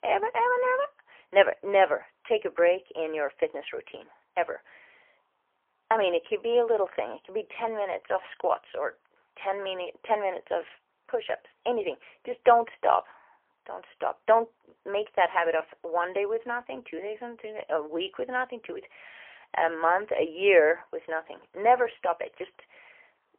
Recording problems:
phone-call audio; poor line; nothing above 3 kHz

